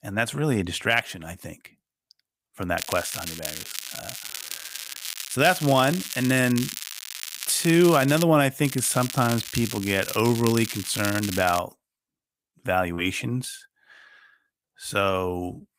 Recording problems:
crackling; loud; from 3 to 5.5 s, from 5.5 to 8 s and from 8.5 to 12 s; 9 dB below the speech

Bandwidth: 15.5 kHz